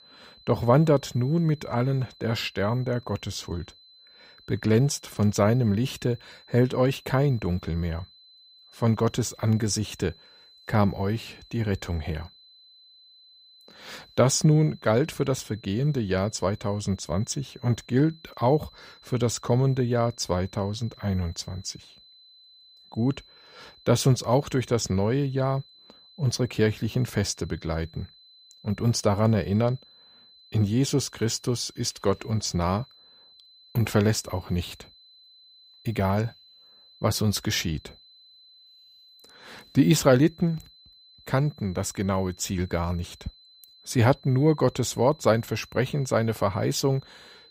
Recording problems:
high-pitched whine; faint; throughout; 4 kHz, 25 dB below the speech

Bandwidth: 15.5 kHz